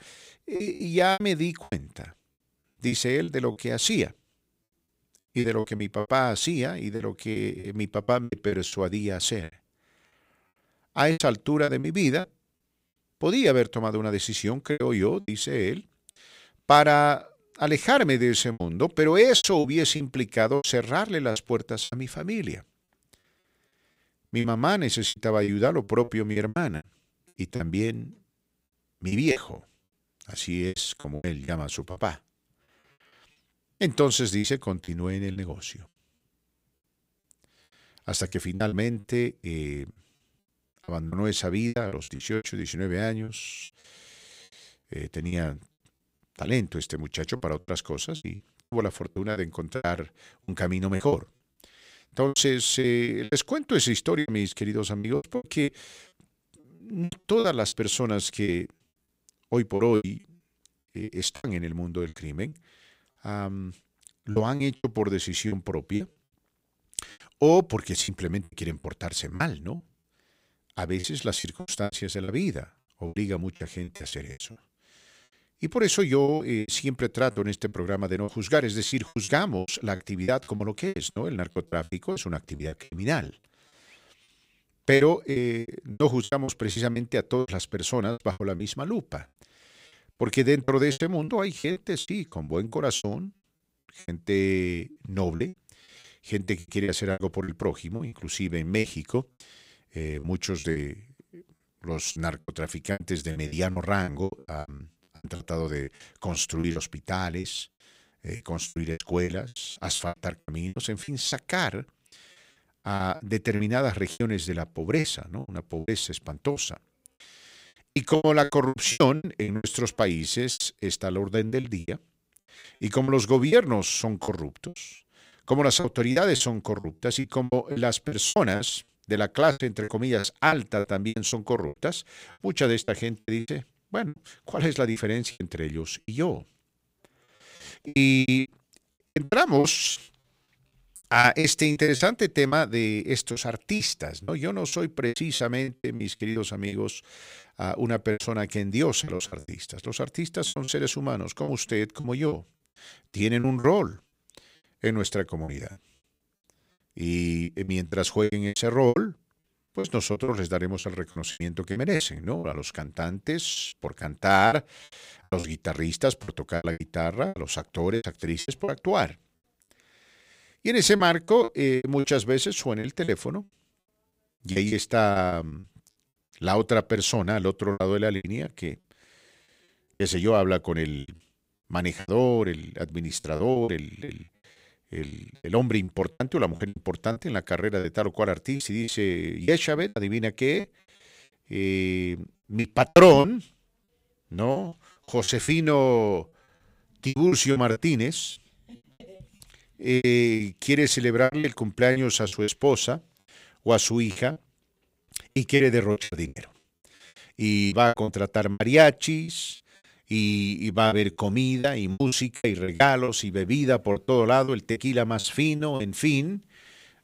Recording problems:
choppy; very; 14% of the speech affected

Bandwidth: 15.5 kHz